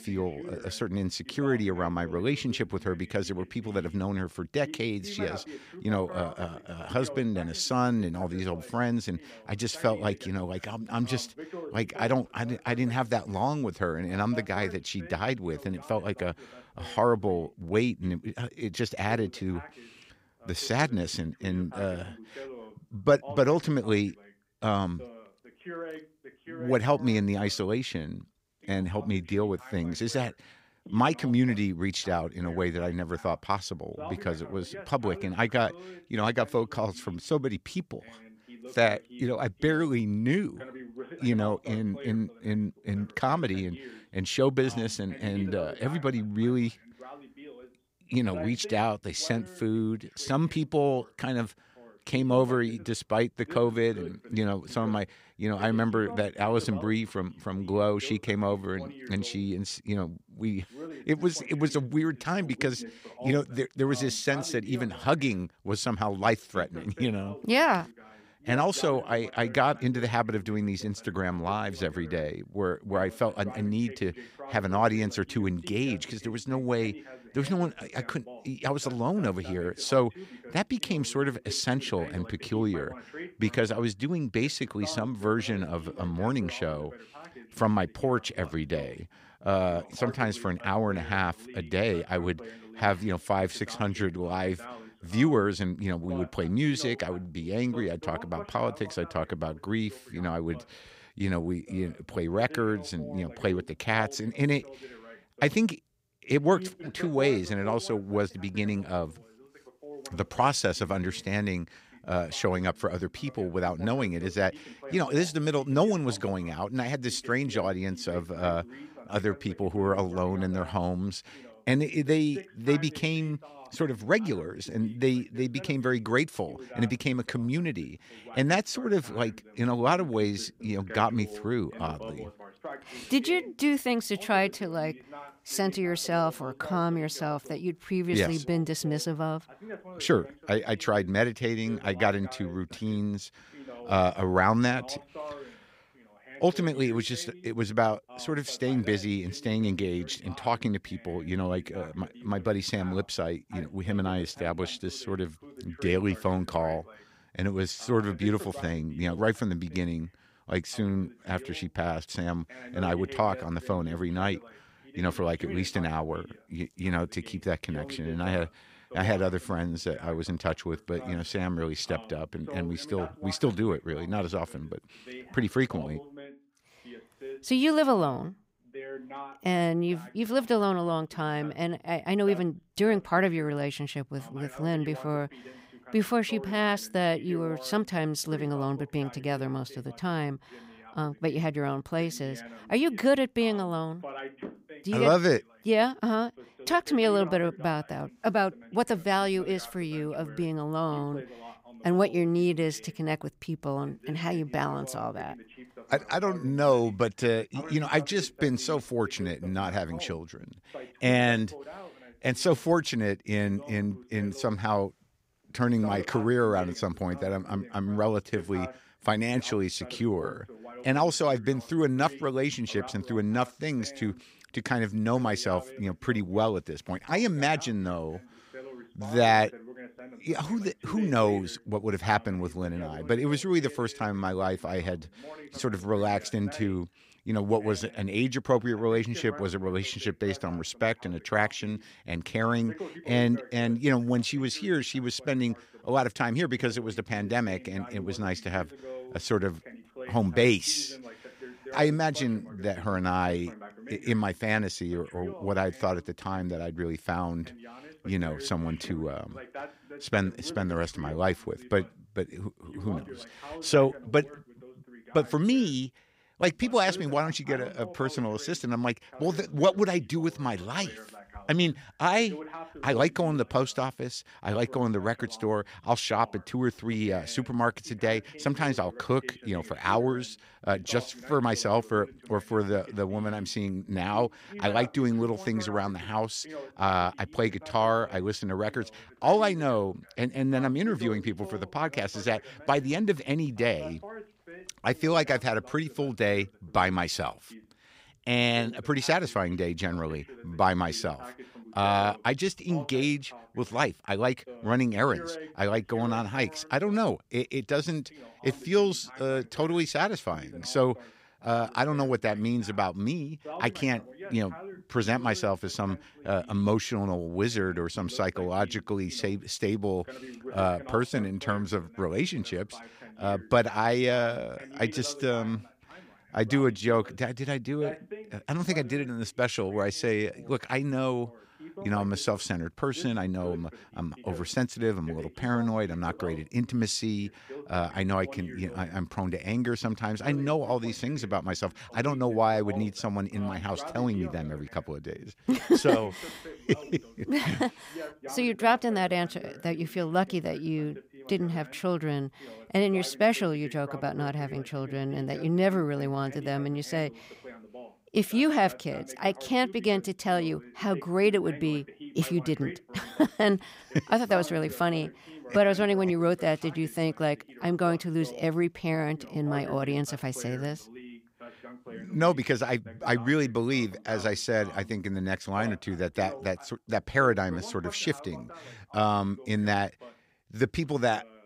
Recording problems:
voice in the background; noticeable; throughout; 15 dB below the speech

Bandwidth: 15.5 kHz